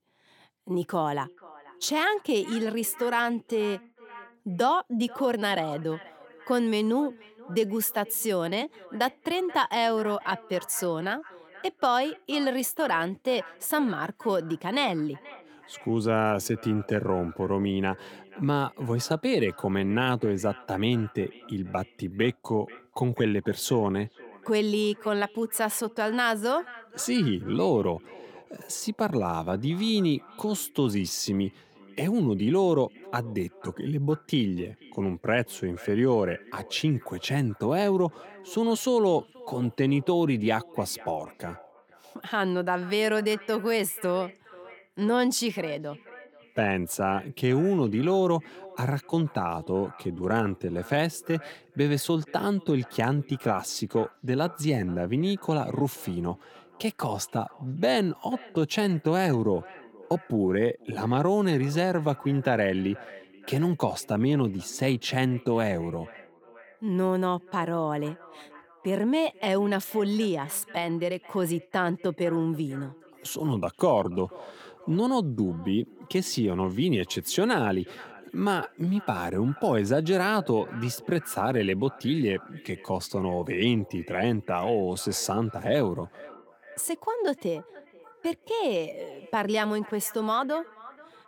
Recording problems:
echo of what is said; faint; throughout; 480 ms later, 20 dB below the speech

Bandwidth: 18 kHz